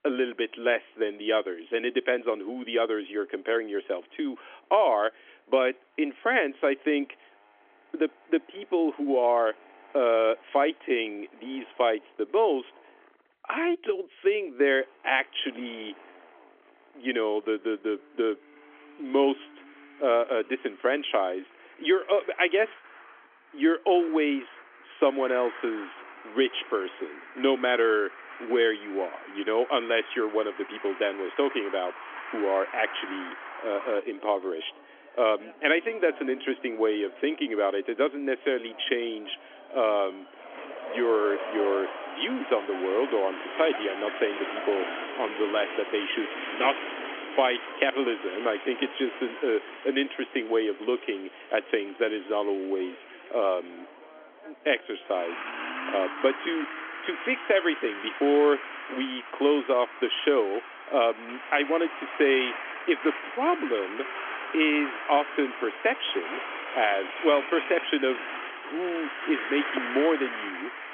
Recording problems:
phone-call audio; nothing above 3.5 kHz
traffic noise; loud; throughout; 10 dB below the speech

